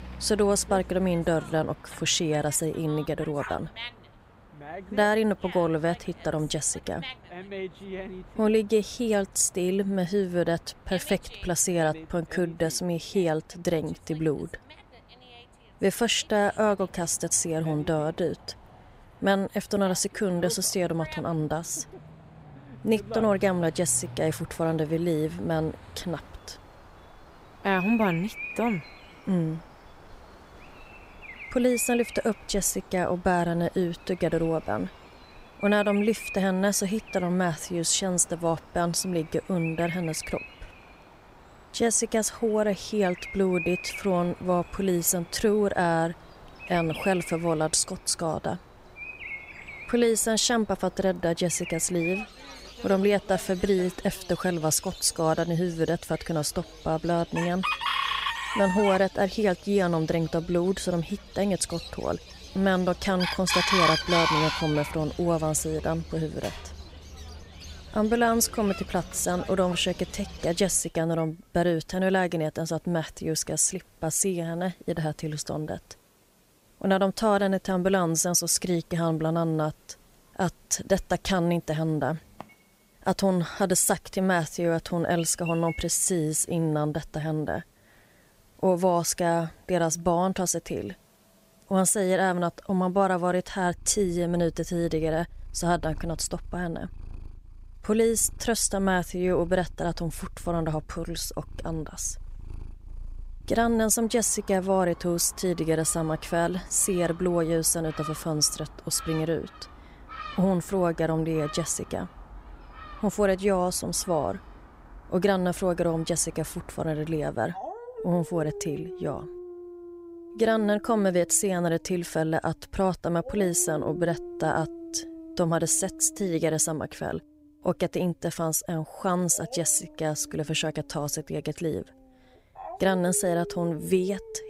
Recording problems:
animal sounds; noticeable; throughout; 10 dB below the speech

